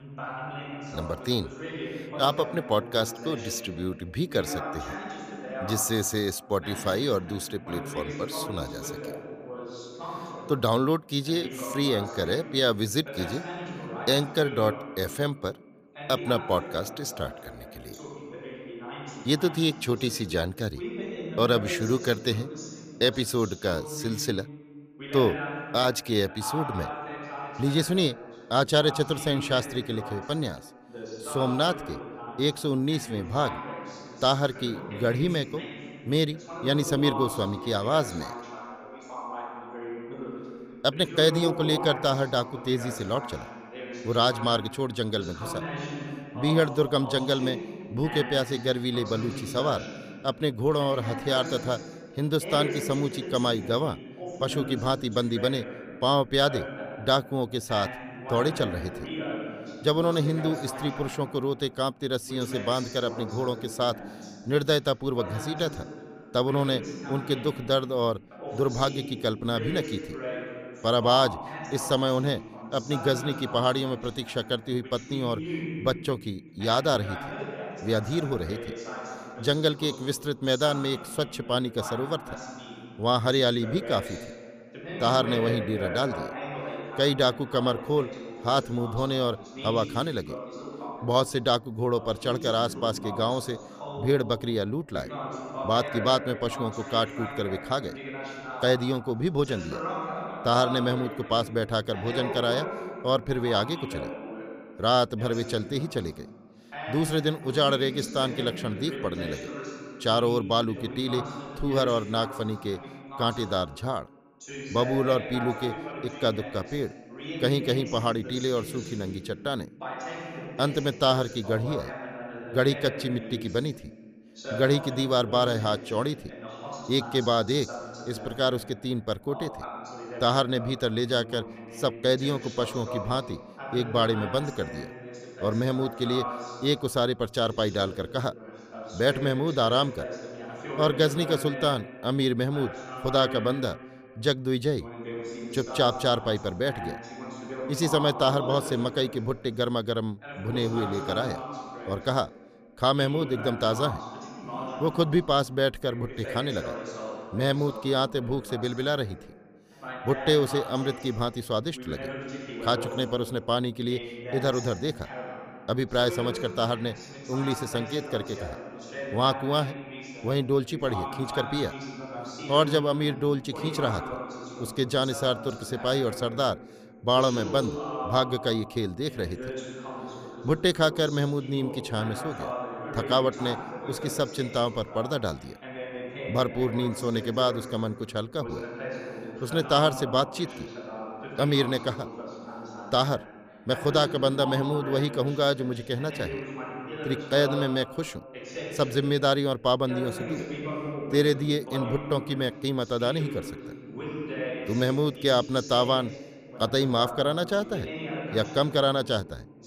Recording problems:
voice in the background; noticeable; throughout; 10 dB below the speech

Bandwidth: 15 kHz